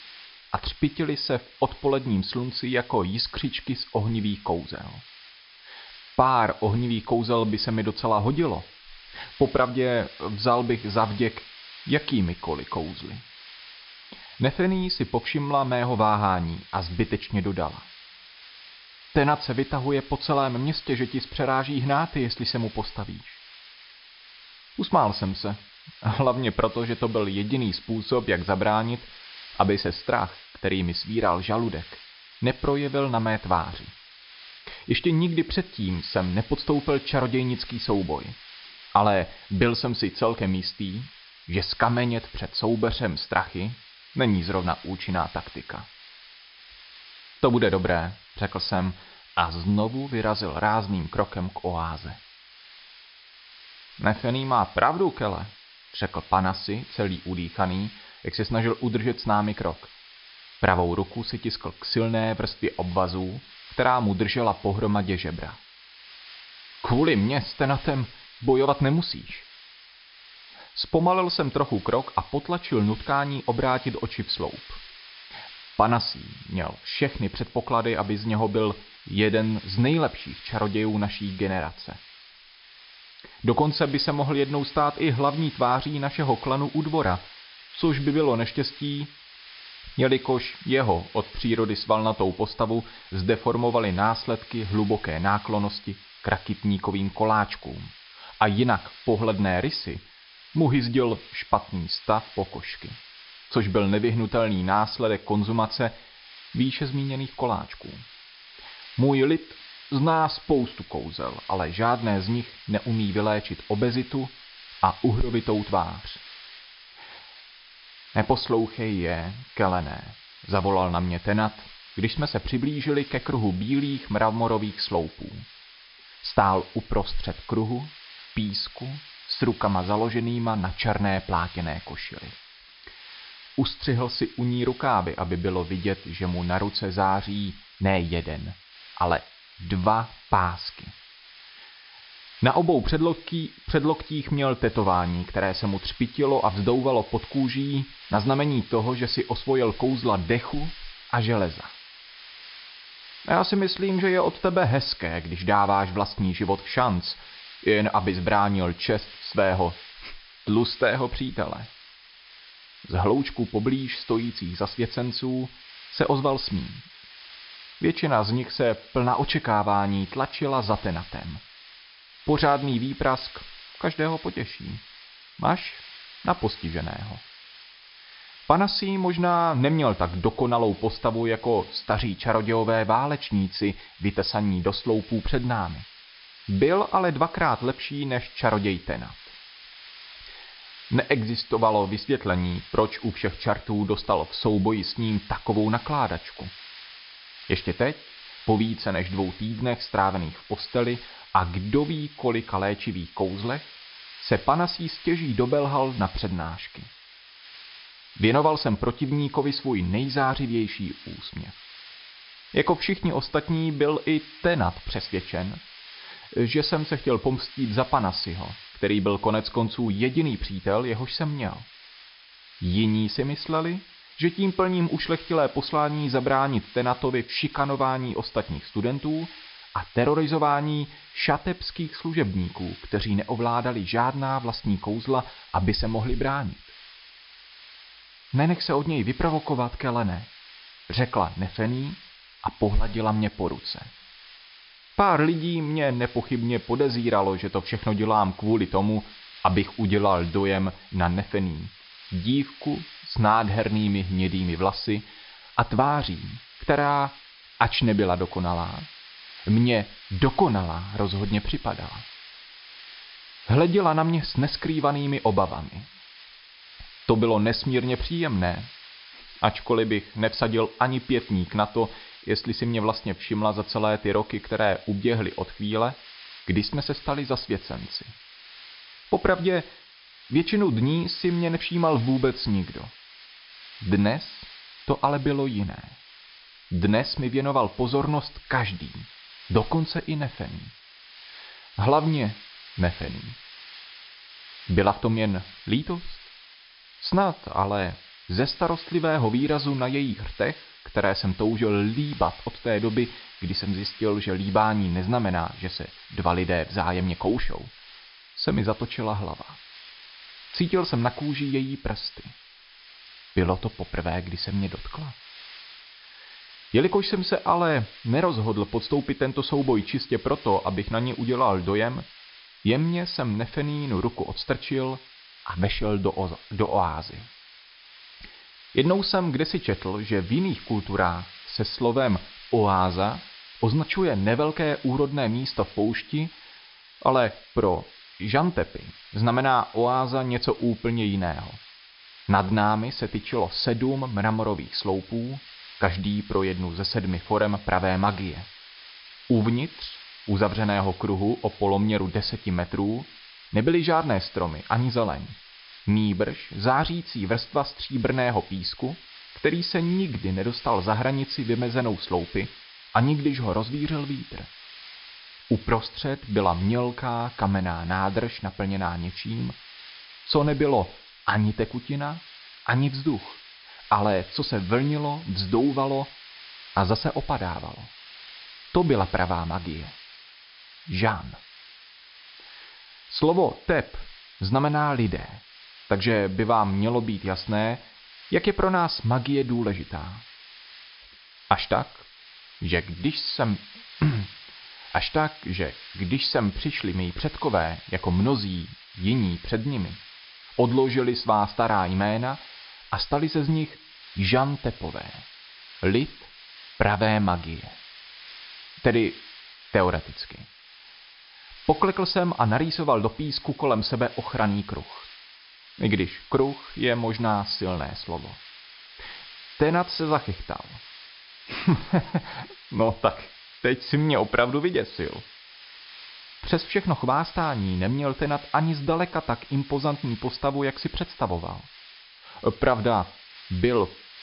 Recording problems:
high frequencies cut off; noticeable; nothing above 5.5 kHz
hiss; noticeable; throughout; 20 dB below the speech

